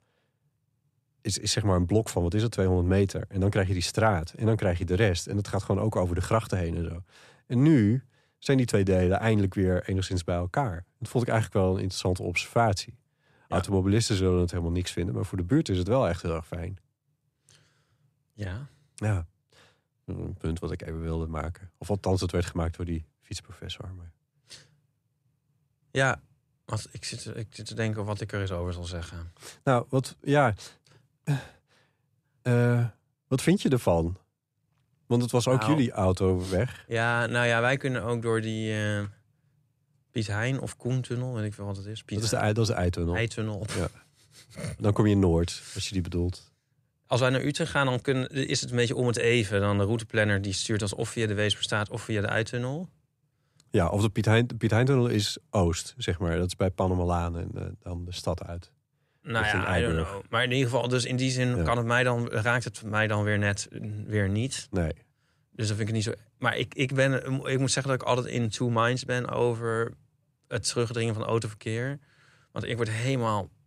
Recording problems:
none

